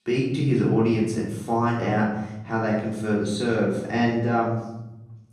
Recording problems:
off-mic speech; far
room echo; noticeable; dies away in 1.1 s

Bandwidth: 13.5 kHz